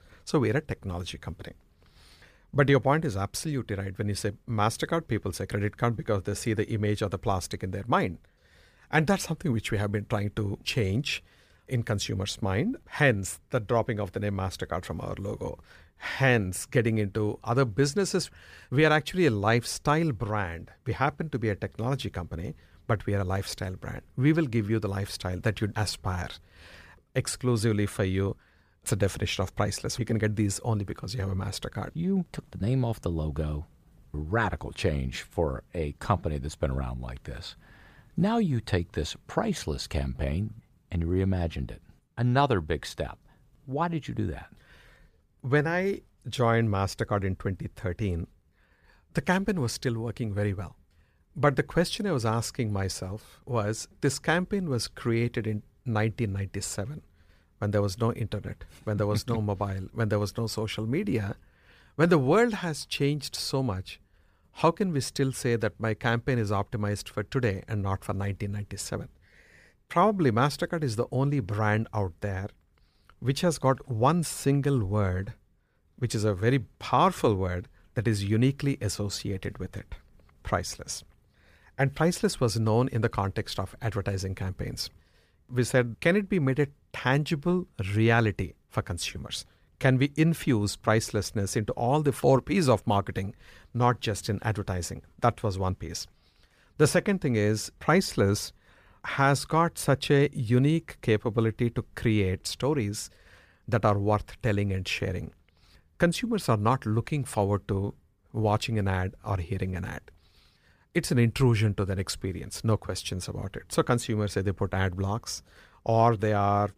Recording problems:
none

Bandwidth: 15 kHz